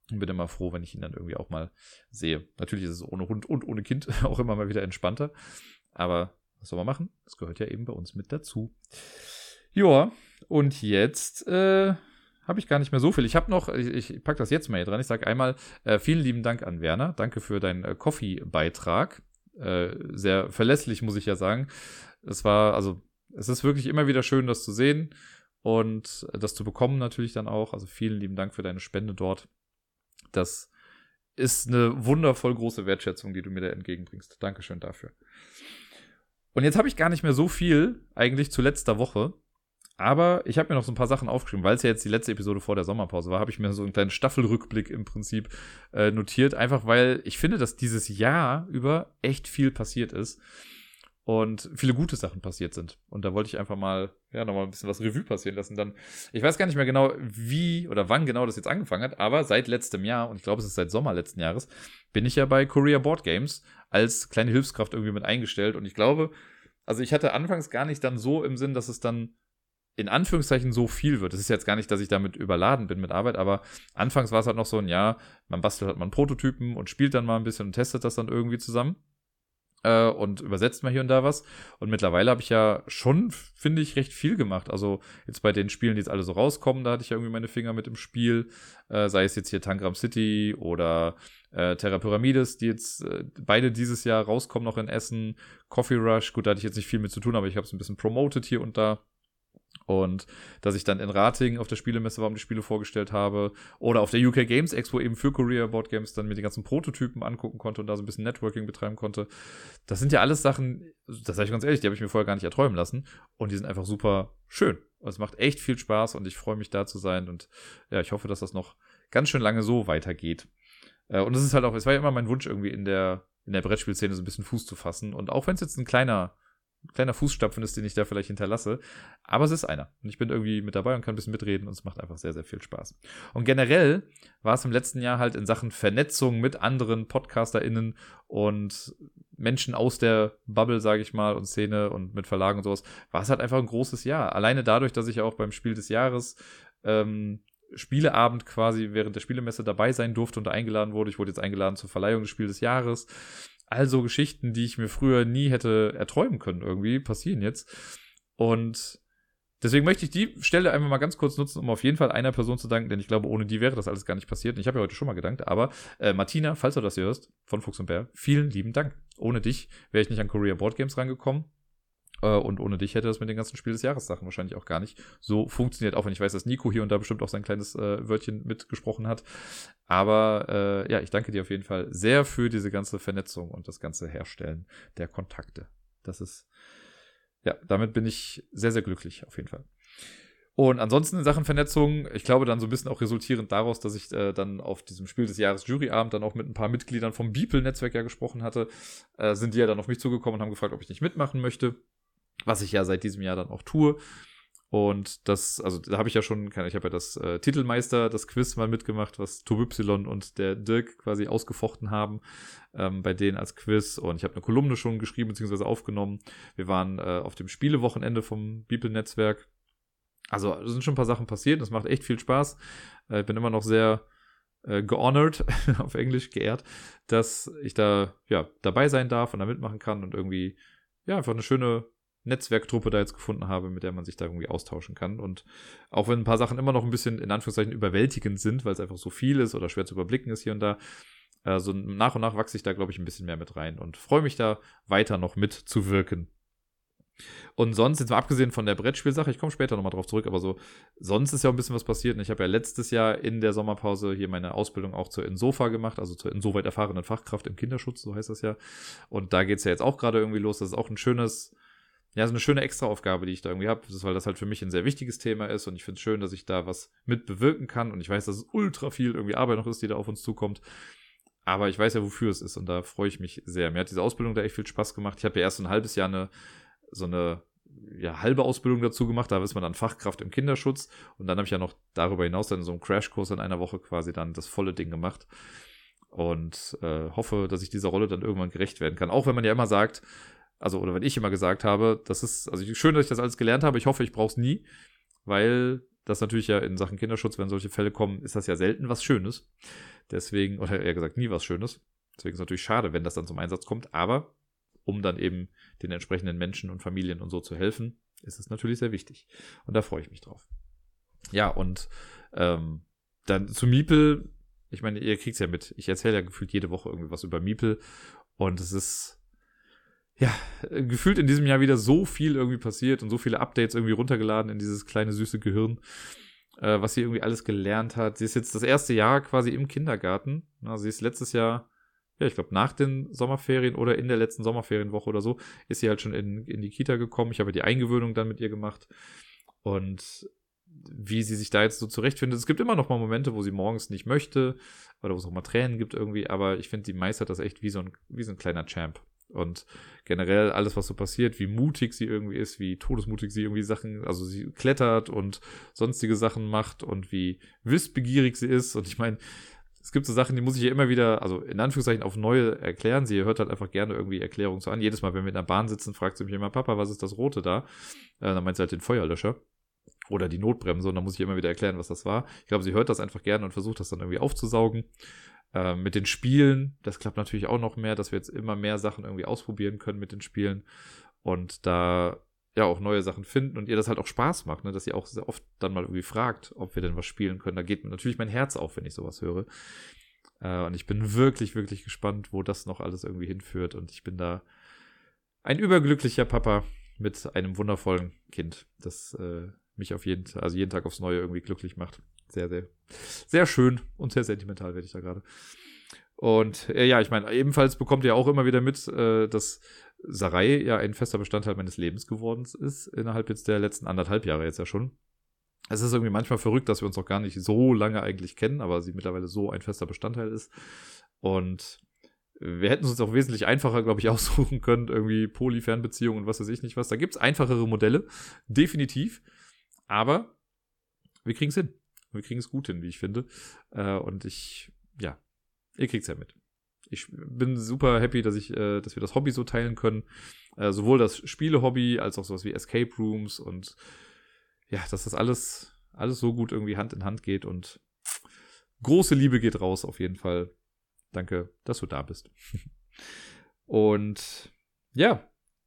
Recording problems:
none

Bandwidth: 17.5 kHz